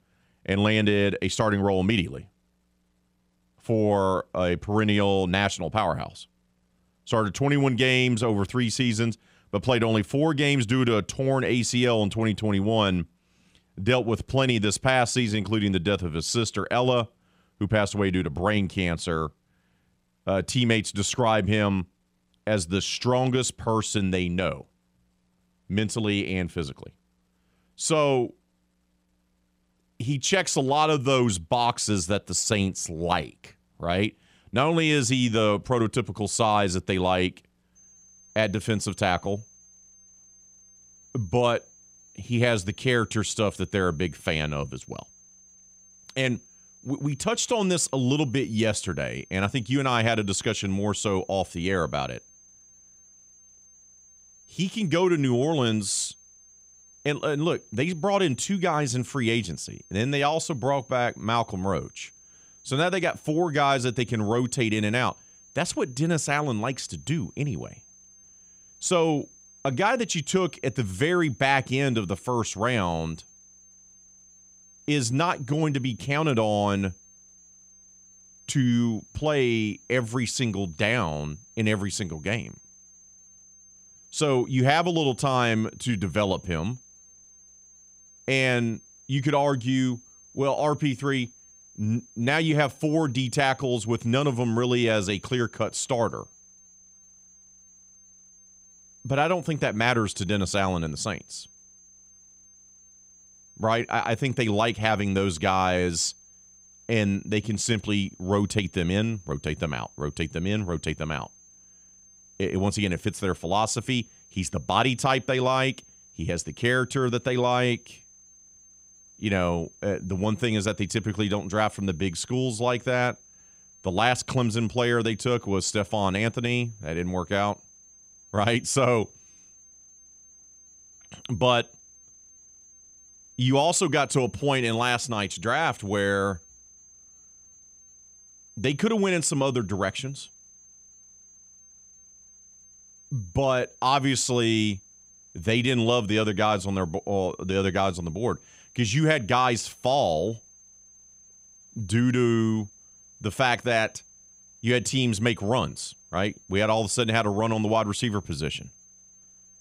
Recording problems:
high-pitched whine; faint; from 38 s on; 6.5 kHz, 25 dB below the speech

